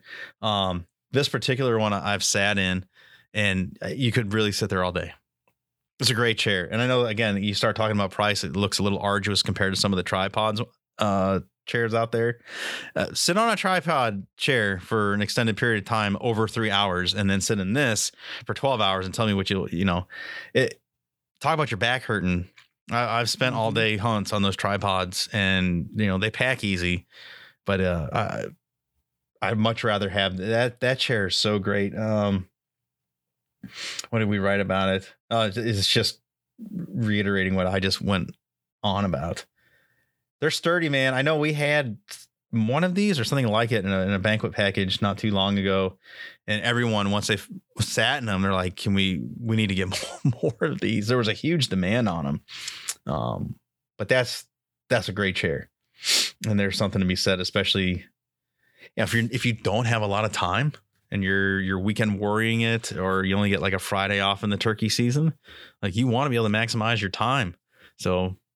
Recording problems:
none

